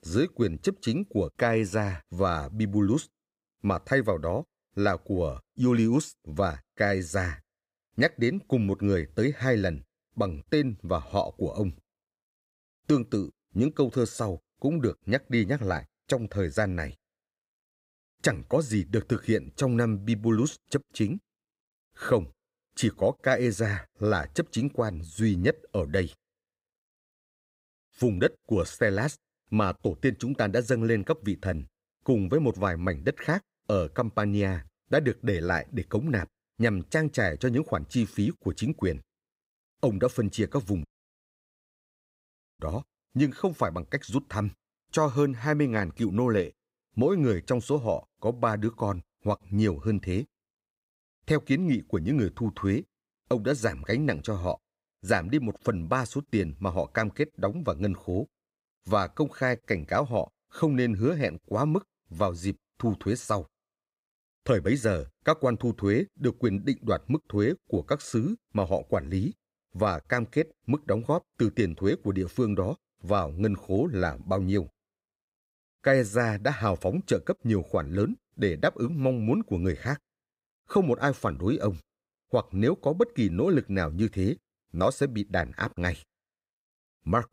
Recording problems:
audio cutting out; at 41 s for 1.5 s

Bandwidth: 15.5 kHz